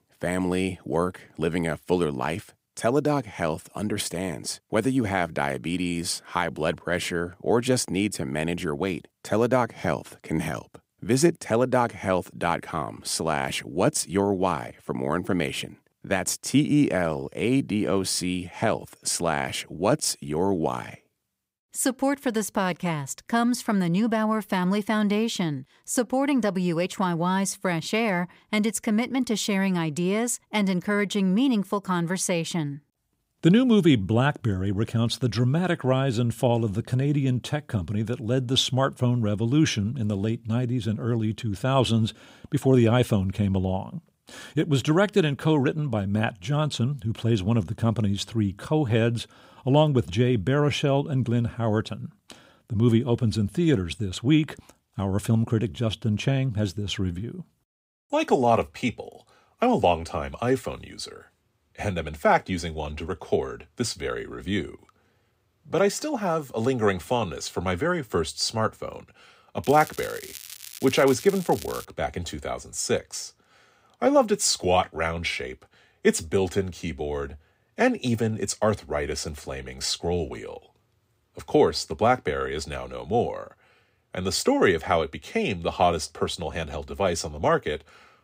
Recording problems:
crackling; noticeable; from 1:10 to 1:12; 15 dB below the speech

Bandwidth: 15.5 kHz